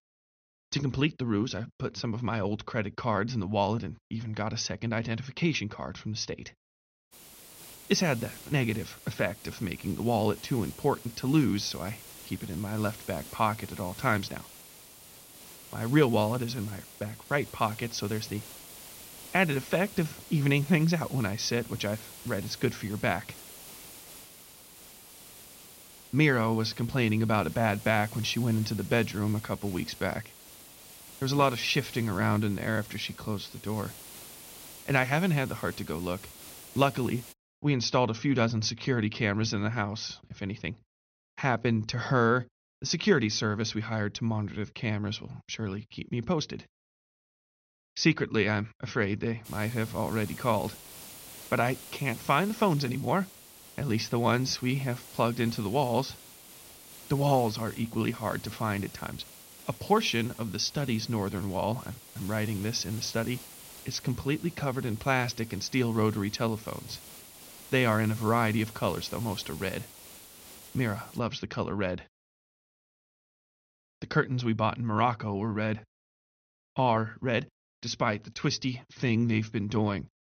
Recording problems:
high frequencies cut off; noticeable; nothing above 6.5 kHz
hiss; noticeable; from 7 to 37 s and from 49 s to 1:11; 15 dB below the speech

